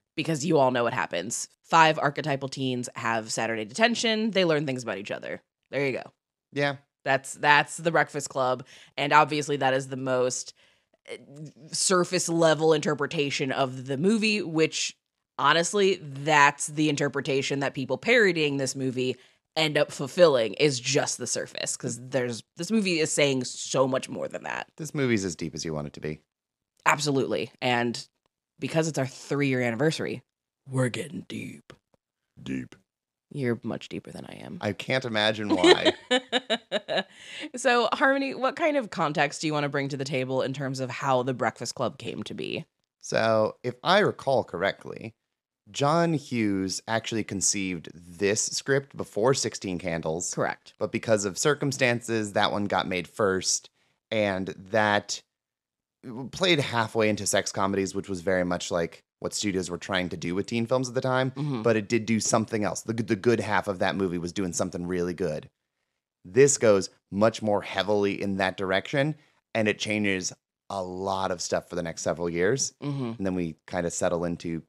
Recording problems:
none

